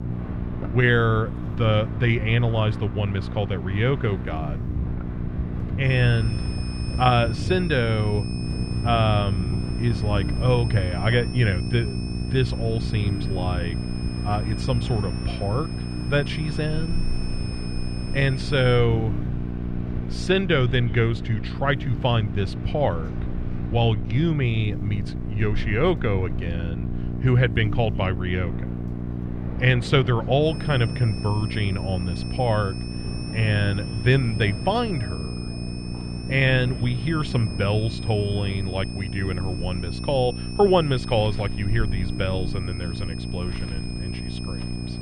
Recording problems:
muffled; slightly; fading above 2.5 kHz
electrical hum; noticeable; throughout; 60 Hz, 15 dB below the speech
high-pitched whine; noticeable; from 6 to 19 s and from 30 s on; 5 kHz, 15 dB below the speech
wind in the background; noticeable; throughout; 10 dB below the speech
household noises; faint; throughout; 25 dB below the speech

